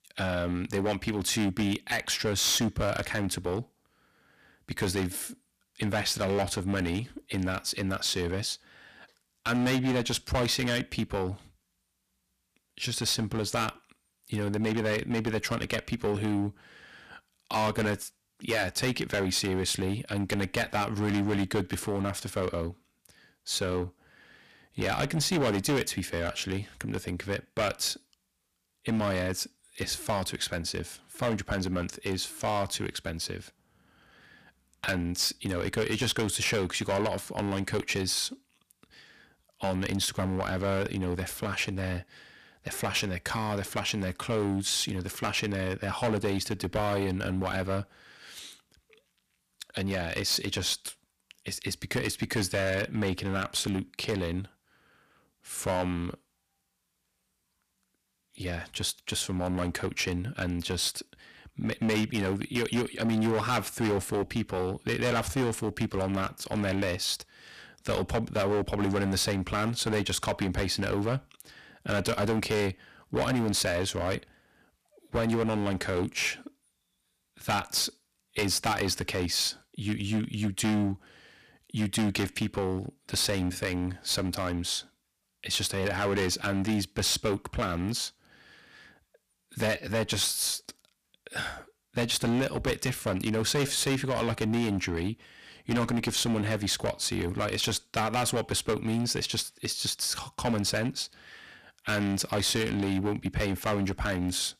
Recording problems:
distortion; heavy; 9% of the sound clipped

